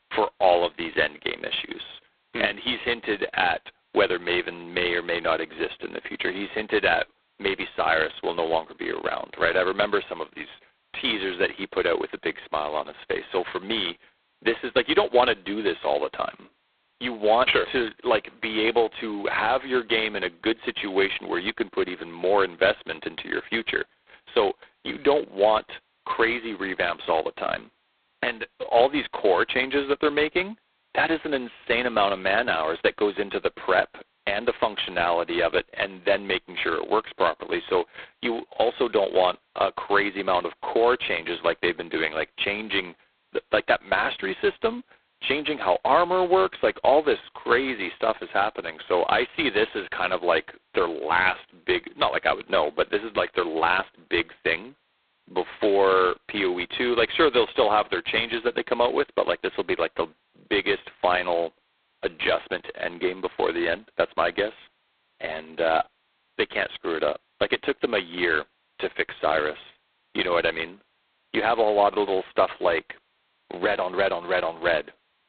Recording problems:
phone-call audio; poor line; nothing above 4 kHz

